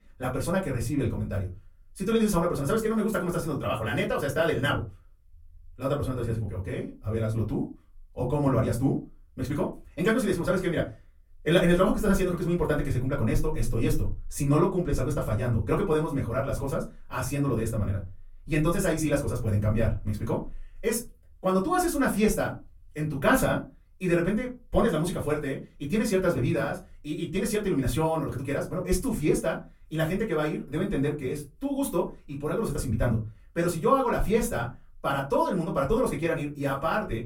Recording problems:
off-mic speech; far
wrong speed, natural pitch; too fast; 1.7 times normal speed
room echo; very slight; dies away in 0.2 s

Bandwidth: 16.5 kHz